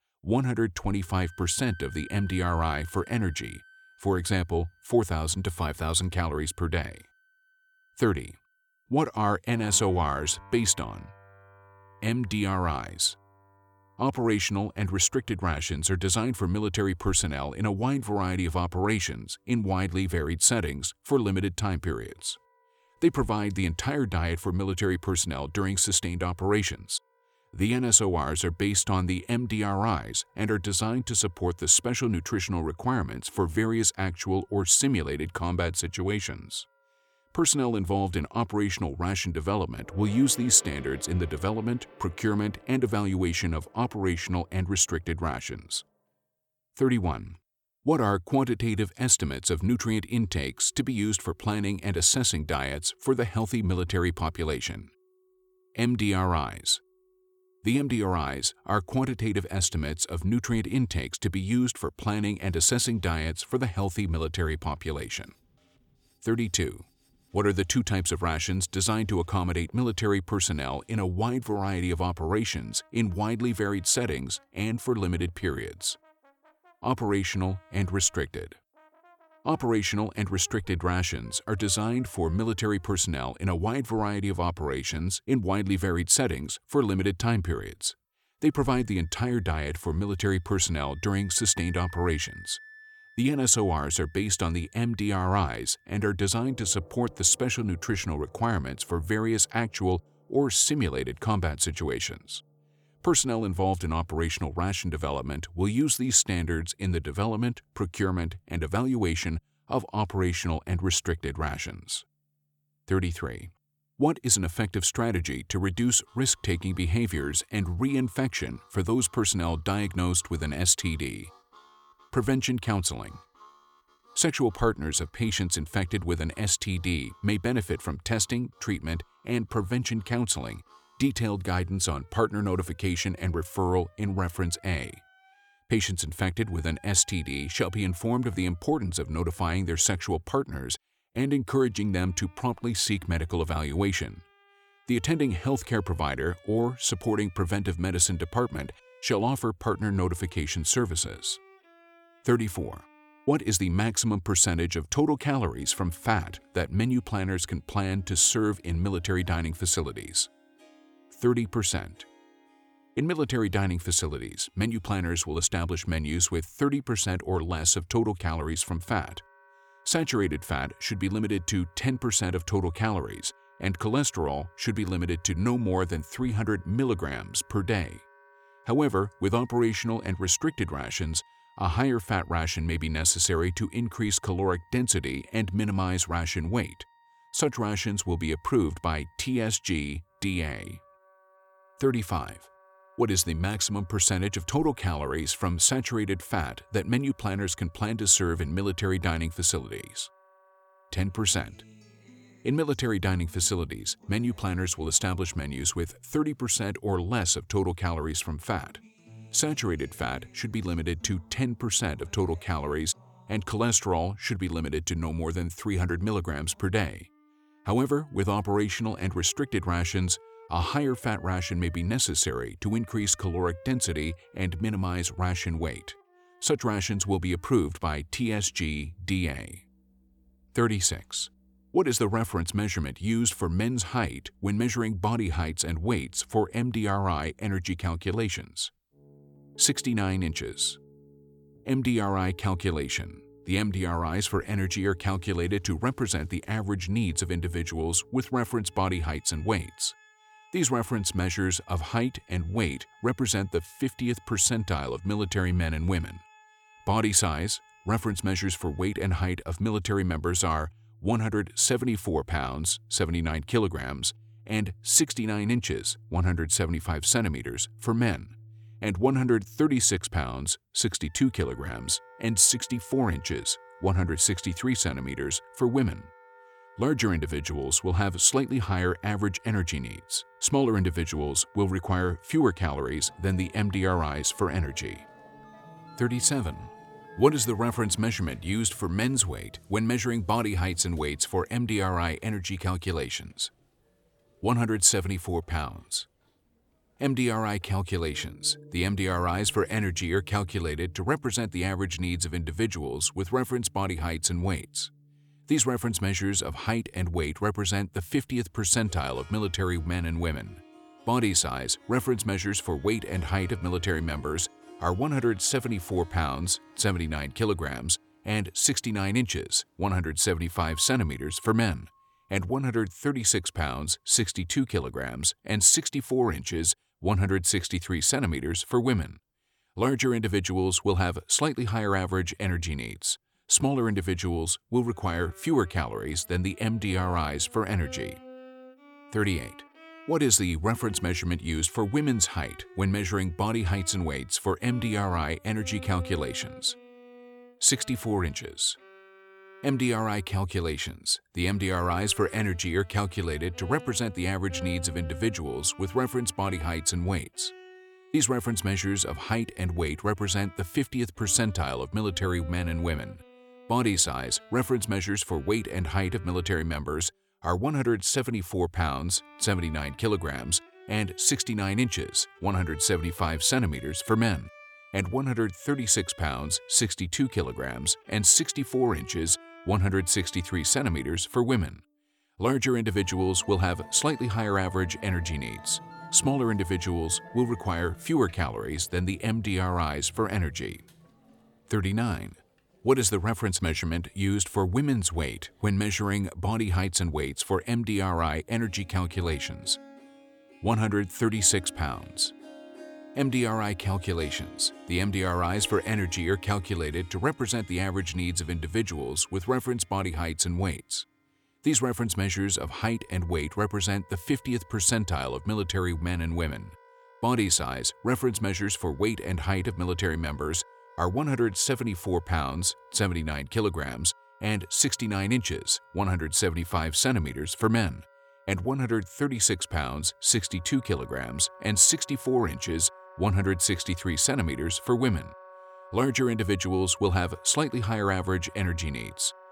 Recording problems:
background music; faint; throughout; 25 dB below the speech

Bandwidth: 18.5 kHz